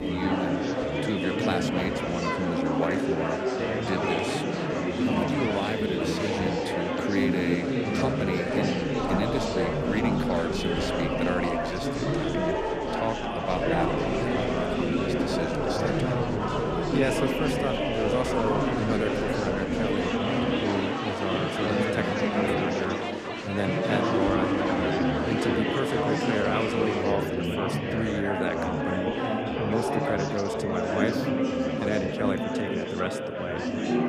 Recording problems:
murmuring crowd; very loud; throughout; 5 dB above the speech

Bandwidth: 15 kHz